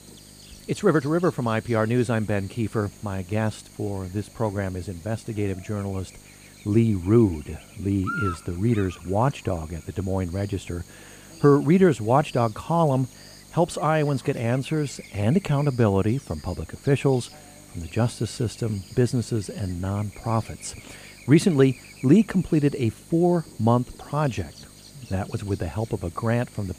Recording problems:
electrical hum; noticeable; throughout; 50 Hz, 15 dB below the speech

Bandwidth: 15 kHz